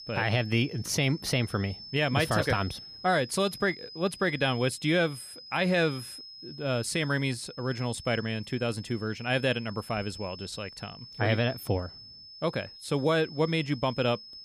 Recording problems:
high-pitched whine; noticeable; throughout; 5 kHz, 15 dB below the speech

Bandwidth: 15 kHz